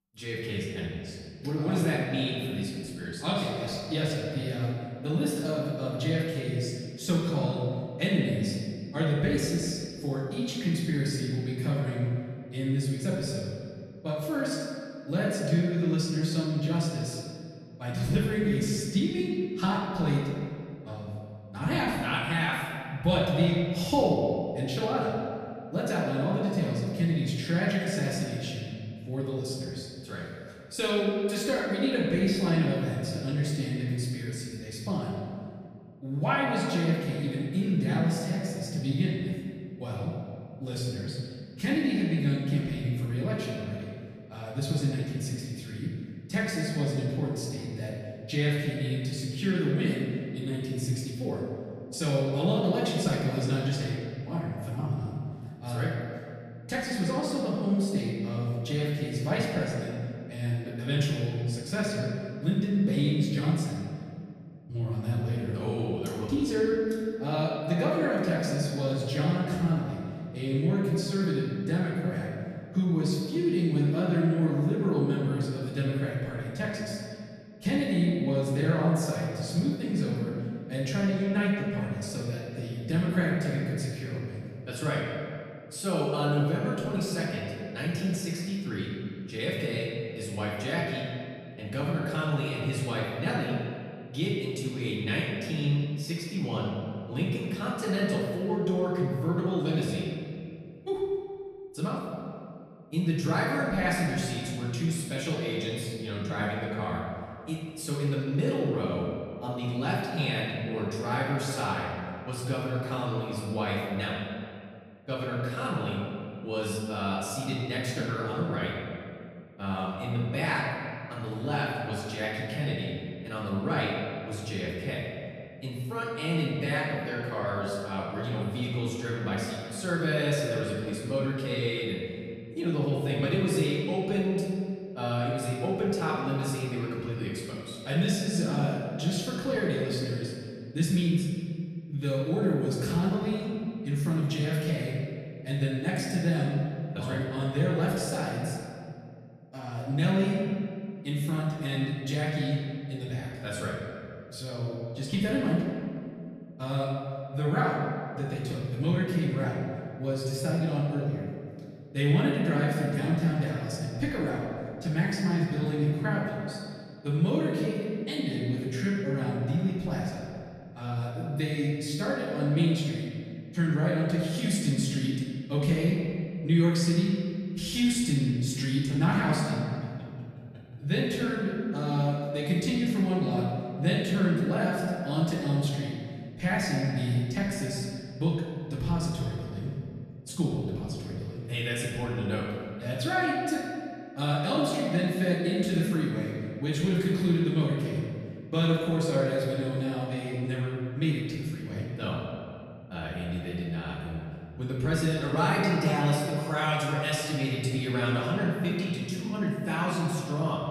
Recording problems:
off-mic speech; far
room echo; noticeable; dies away in 2 s

